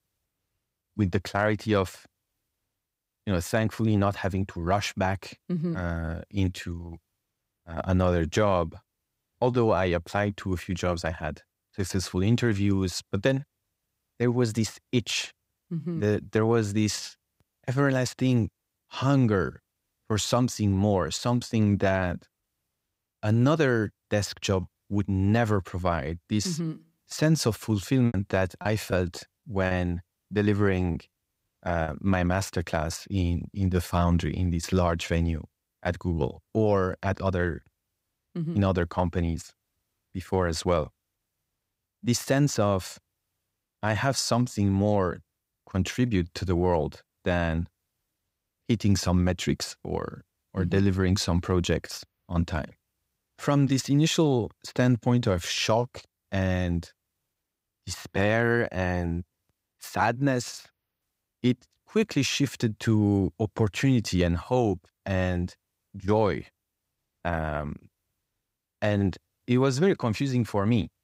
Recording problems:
choppy; very; from 28 to 32 s; 8% of the speech affected

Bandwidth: 15.5 kHz